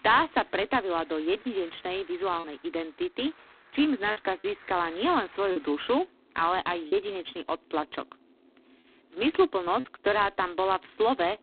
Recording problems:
phone-call audio; poor line; nothing above 4 kHz
traffic noise; faint; throughout; 30 dB below the speech
choppy; occasionally; 3% of the speech affected

